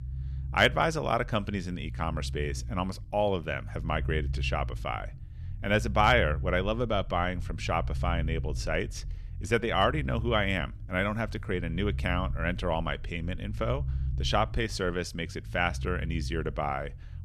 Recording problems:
low rumble; faint; throughout; 25 dB below the speech

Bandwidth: 13.5 kHz